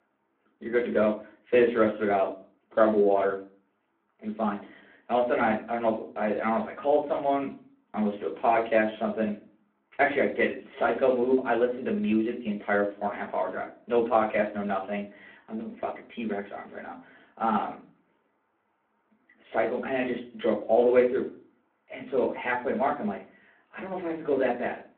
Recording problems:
off-mic speech; far
phone-call audio; nothing above 3.5 kHz
room echo; very slight; dies away in 0.3 s

